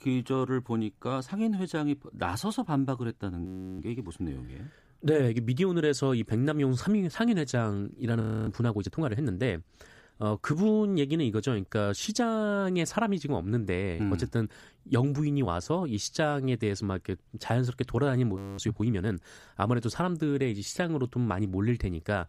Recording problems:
audio freezing; at 3.5 s, at 8 s and at 18 s

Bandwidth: 15 kHz